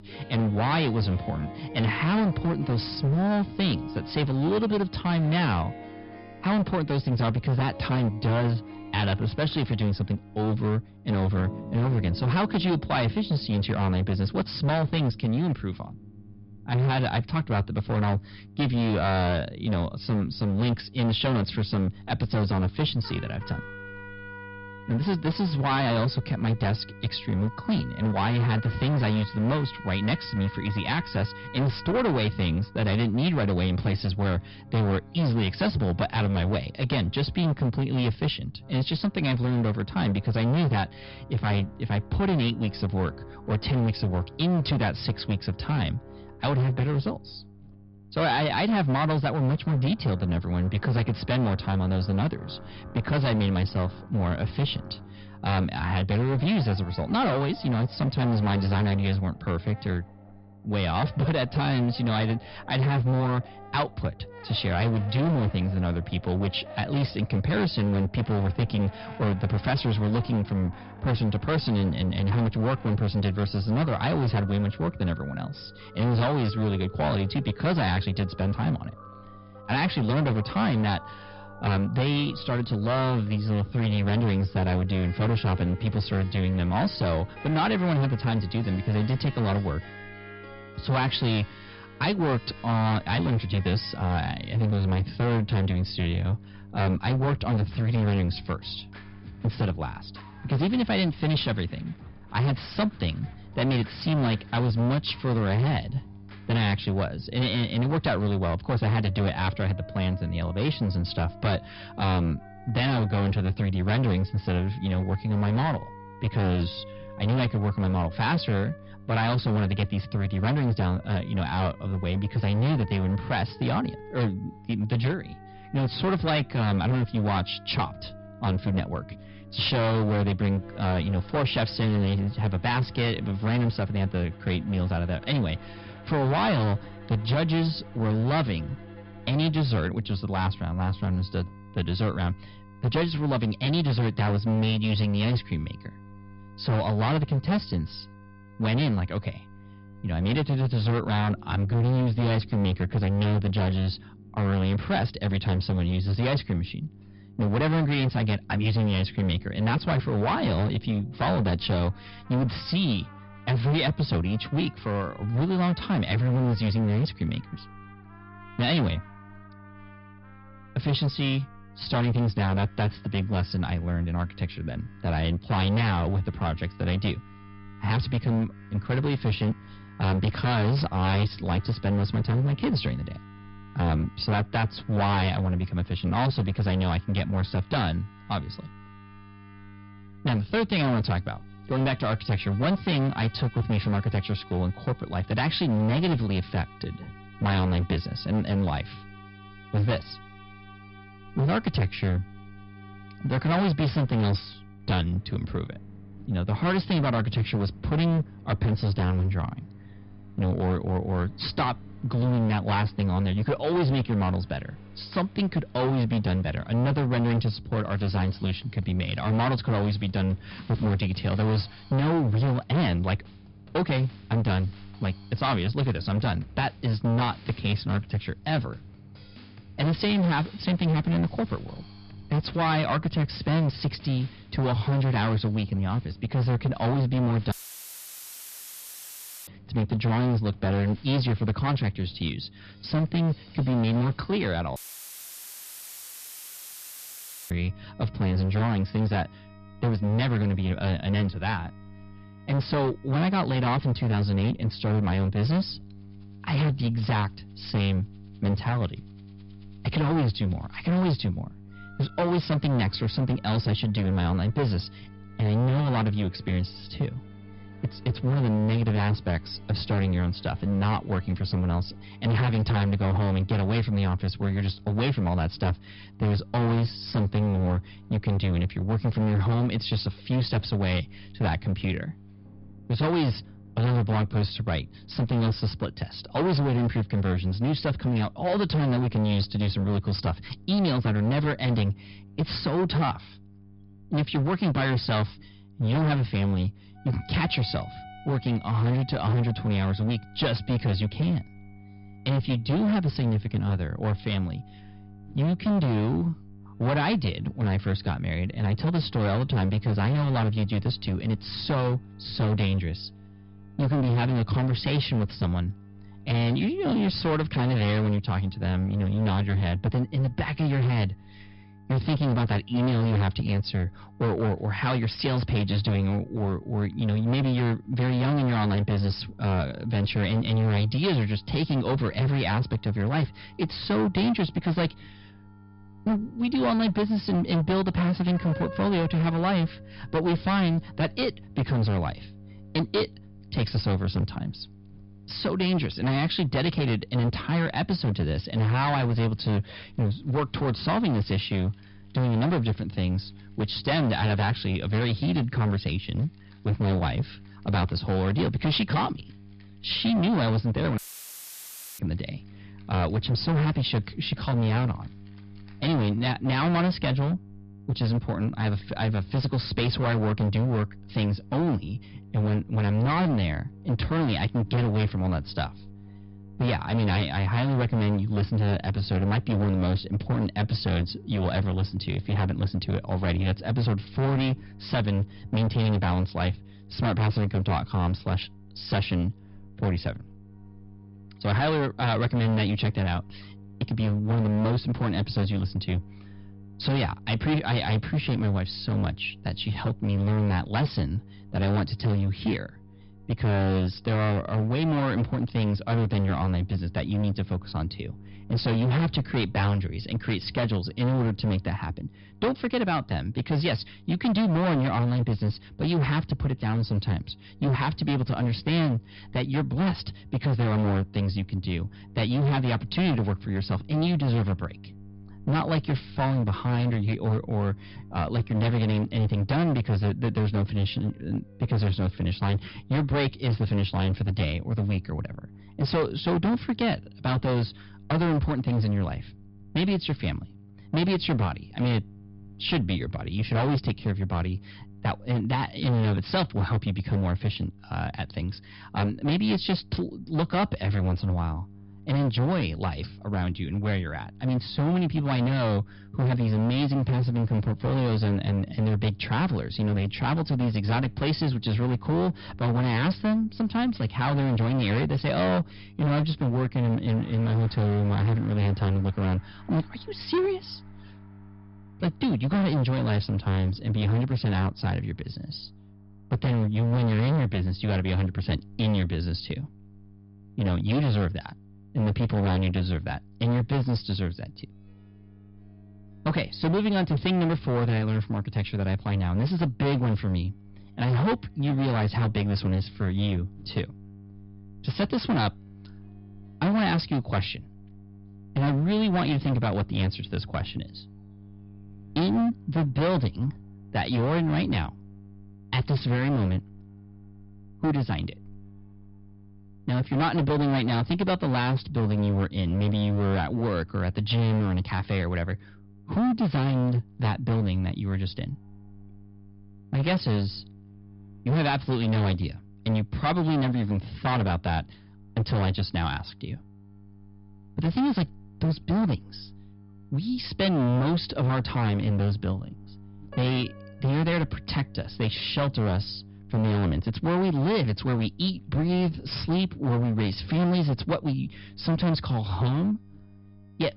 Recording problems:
distortion; heavy; 18% of the sound clipped
high frequencies cut off; noticeable; nothing above 5 kHz
electrical hum; faint; throughout; 50 Hz, 25 dB below the speech
background music; faint; throughout; 20 dB below the speech
audio cutting out; filled with static; at 3:58 for 2 s, at 4:05 for 2.5 s and at 6:01 for 1 s

